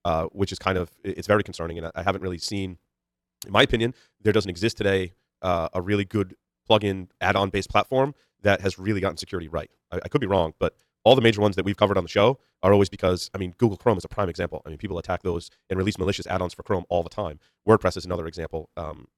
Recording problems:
wrong speed, natural pitch; too fast; 1.5 times normal speed

